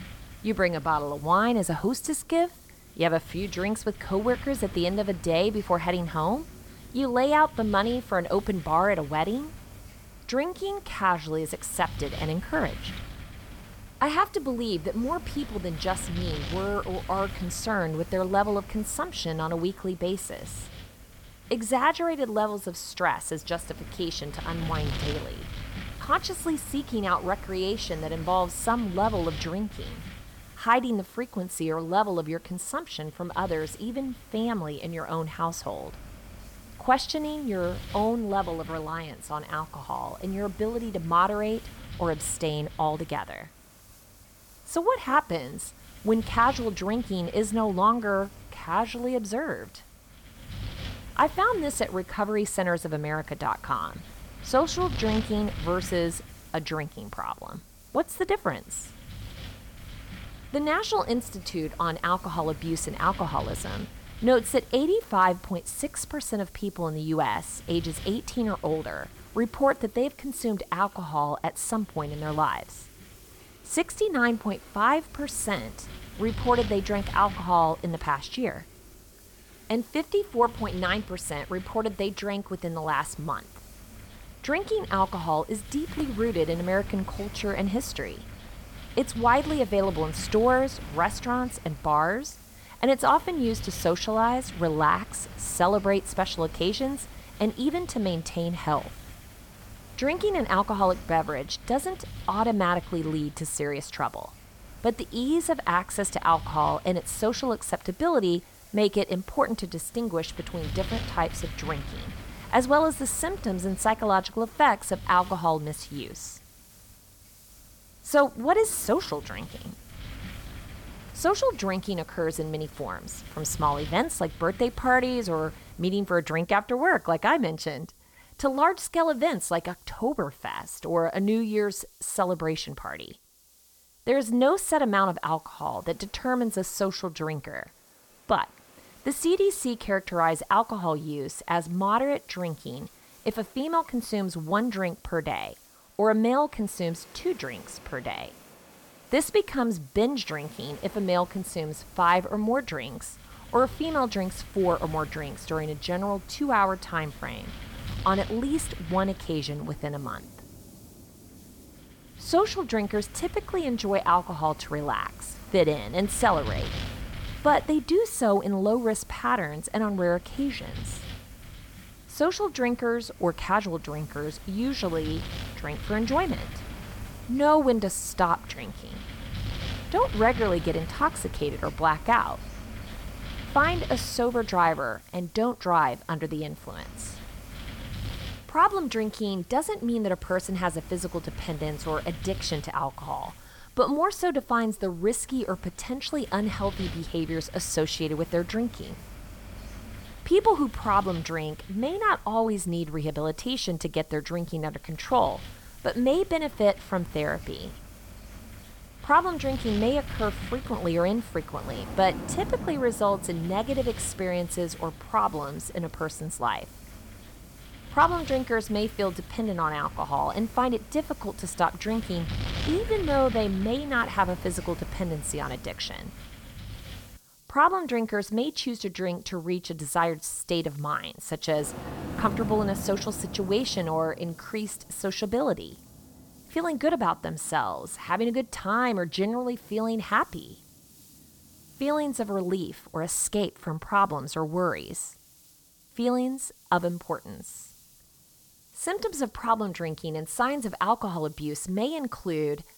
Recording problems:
wind noise on the microphone; occasional gusts; until 2:06 and from 2:31 to 3:47; 20 dB below the speech
rain or running water; faint; throughout; 25 dB below the speech
hiss; faint; throughout; 25 dB below the speech

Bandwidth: 18 kHz